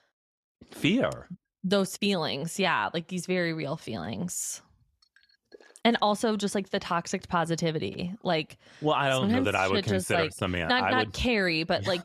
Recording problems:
none

